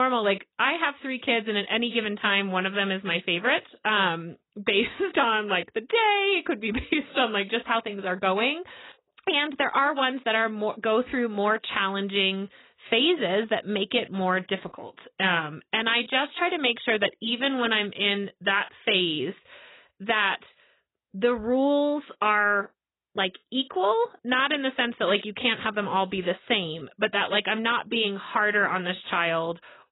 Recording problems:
garbled, watery; badly; nothing above 4 kHz
abrupt cut into speech; at the start

